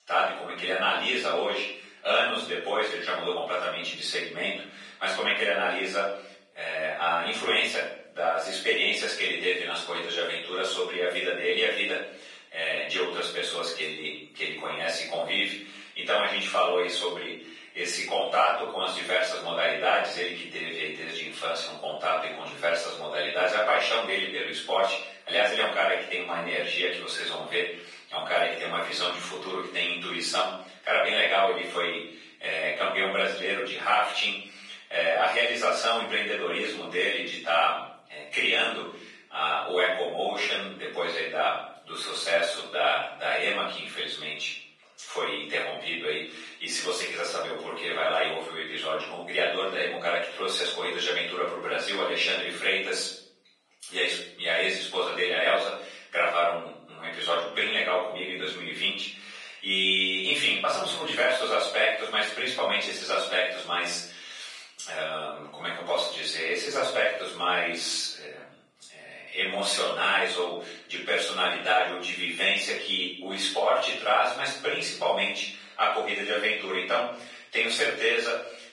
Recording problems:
off-mic speech; far
garbled, watery; badly; nothing above 10.5 kHz
thin; very; fading below 700 Hz
room echo; noticeable; dies away in 0.7 s

